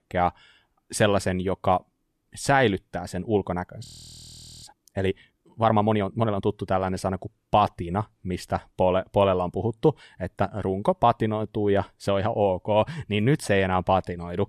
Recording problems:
audio freezing; at 4 s for 1 s

